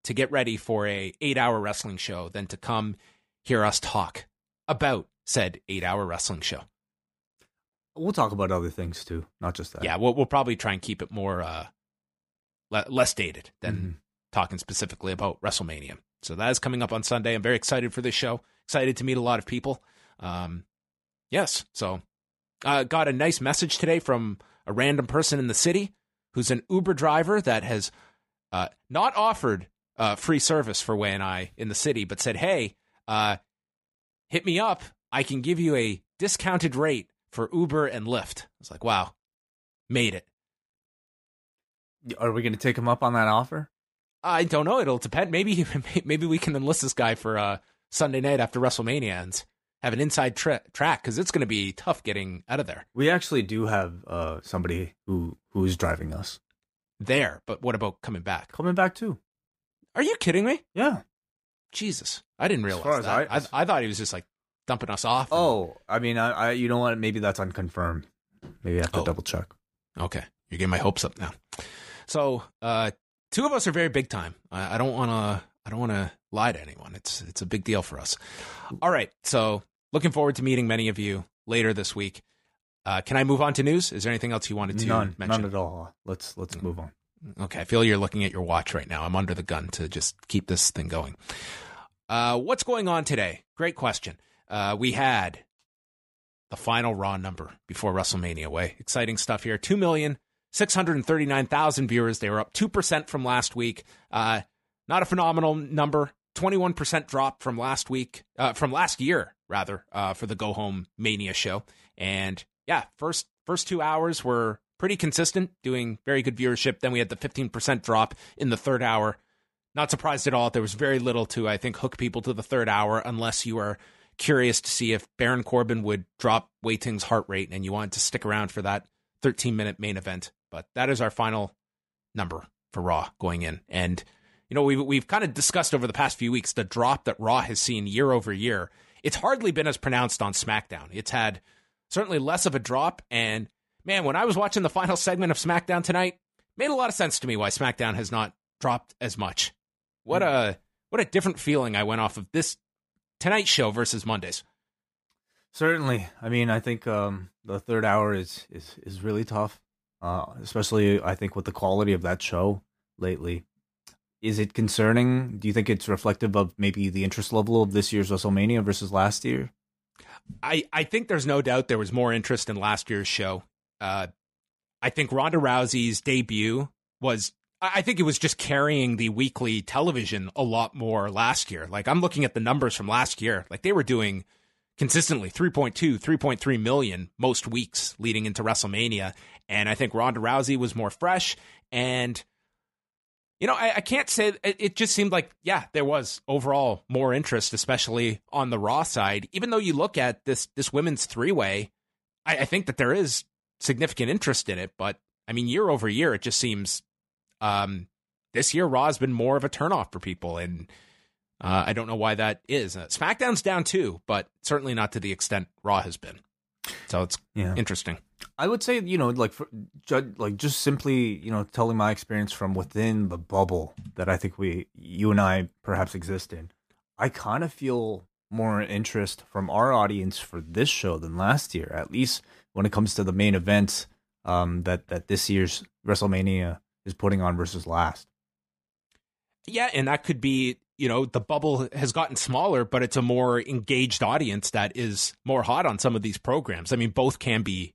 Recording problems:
none

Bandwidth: 15 kHz